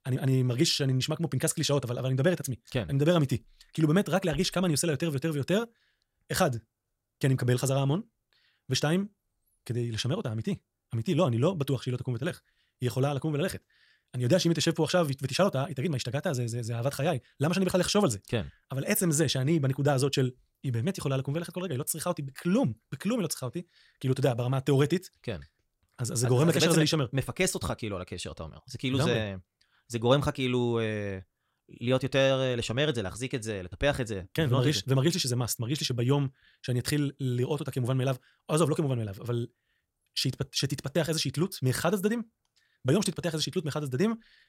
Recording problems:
wrong speed, natural pitch; too fast; 1.5 times normal speed

